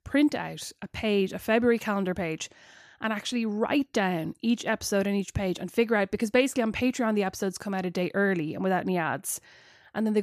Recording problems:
abrupt cut into speech; at the end

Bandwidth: 14.5 kHz